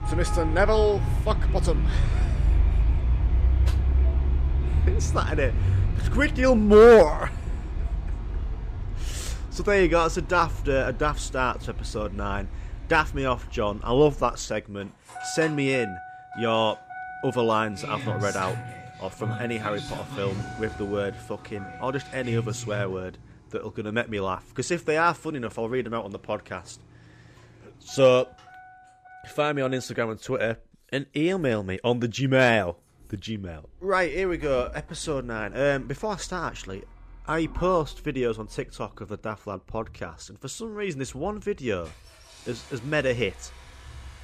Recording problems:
traffic noise; loud; throughout; 4 dB below the speech

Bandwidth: 14.5 kHz